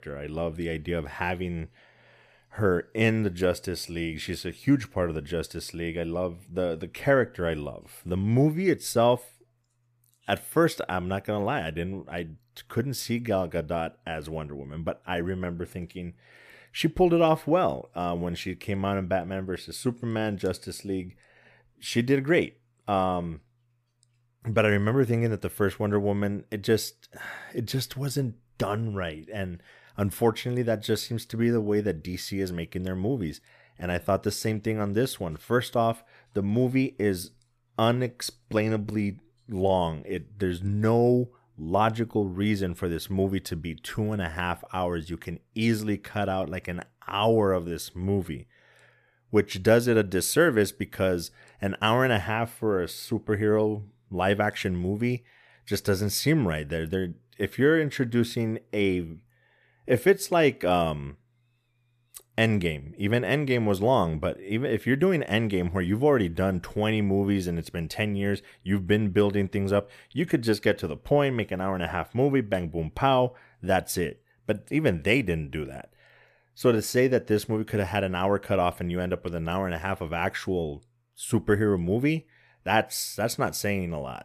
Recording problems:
none

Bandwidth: 14.5 kHz